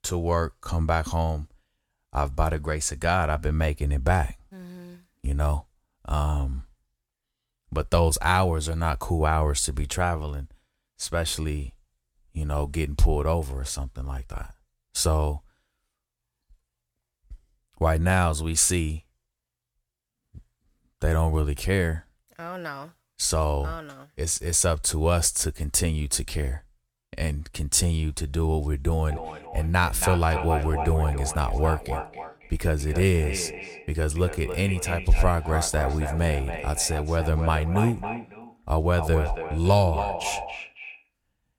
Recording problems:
echo of what is said; strong; from 29 s on; 280 ms later, 9 dB below the speech

